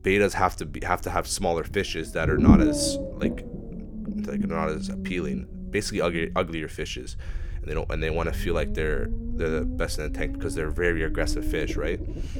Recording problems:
low rumble; loud; throughout; 5 dB below the speech

